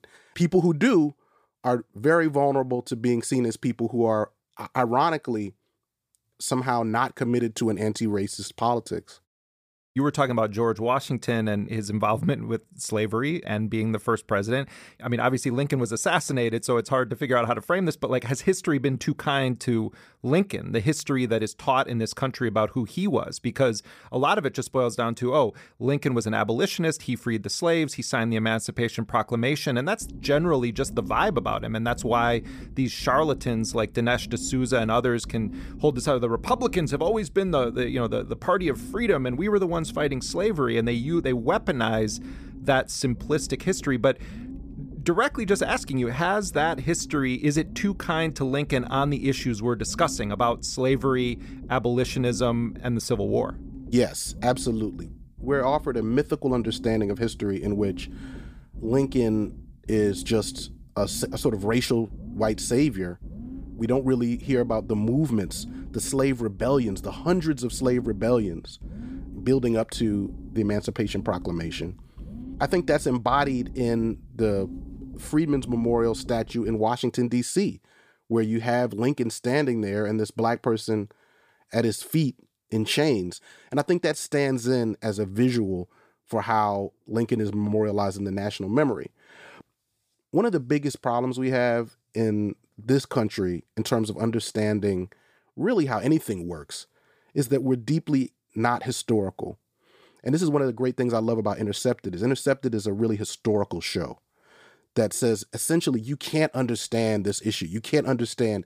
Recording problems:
low rumble; faint; from 30 s to 1:17; 20 dB below the speech

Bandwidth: 15 kHz